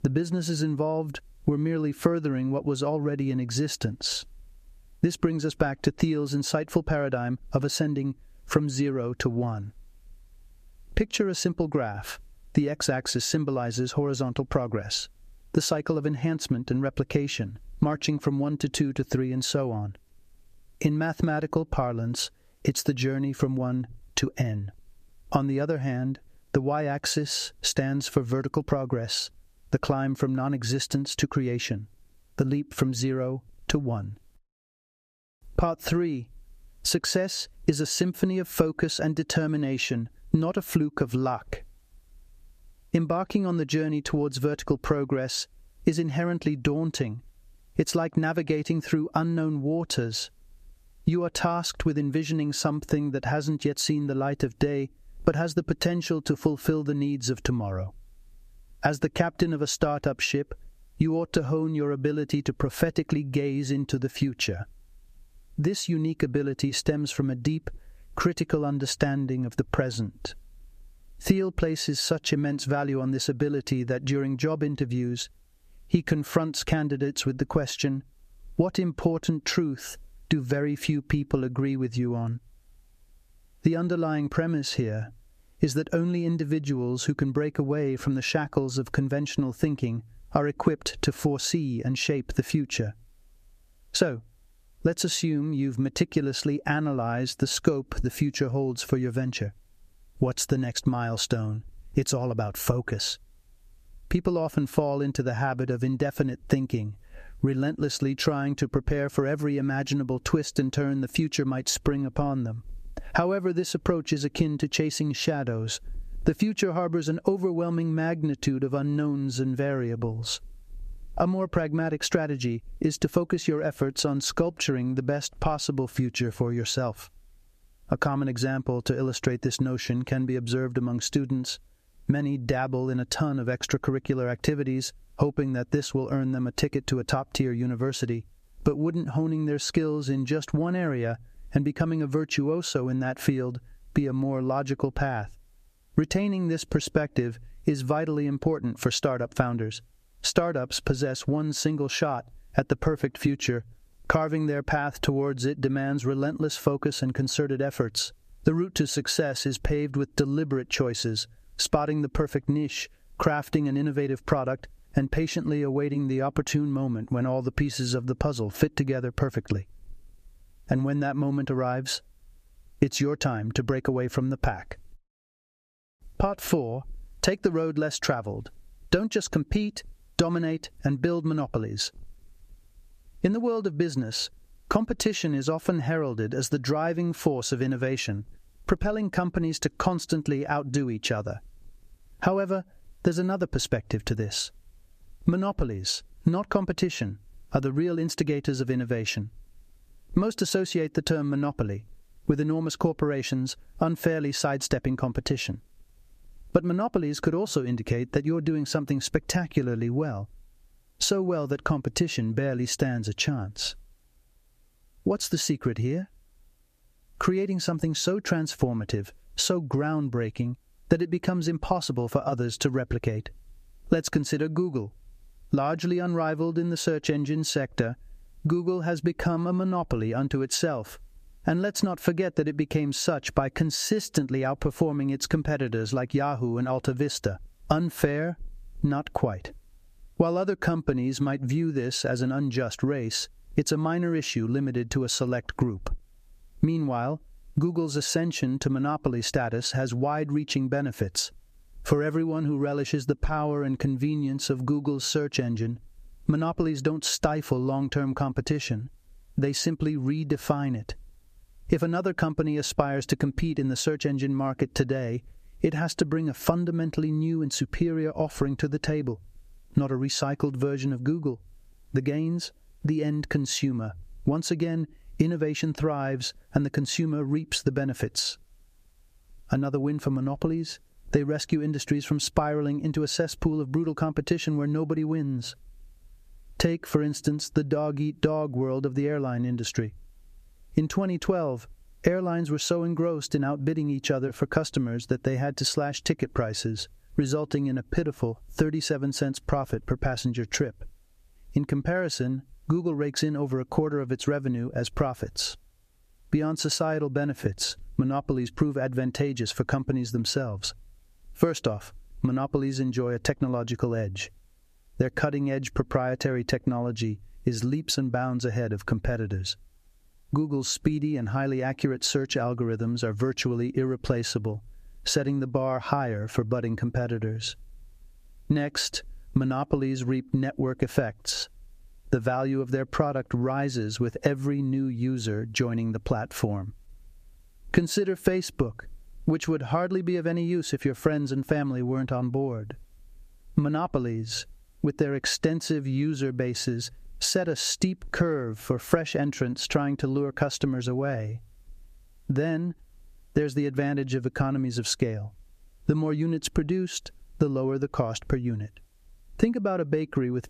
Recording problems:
squashed, flat; somewhat

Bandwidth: 14.5 kHz